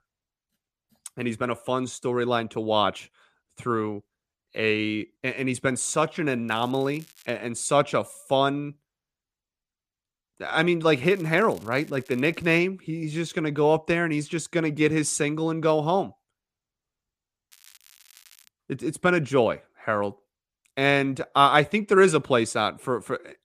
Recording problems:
crackling; faint; at 6.5 s, from 11 to 13 s and at 18 s; 25 dB below the speech

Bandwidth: 14.5 kHz